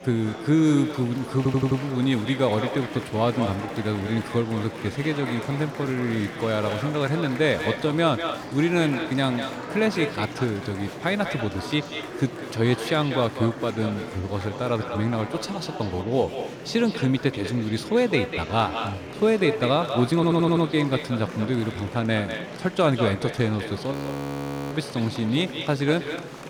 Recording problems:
echo of what is said; strong; throughout; 190 ms later, 10 dB below the speech
murmuring crowd; noticeable; throughout; 10 dB below the speech
audio stuttering; at 1.5 s and at 20 s
audio freezing; at 24 s for 1 s

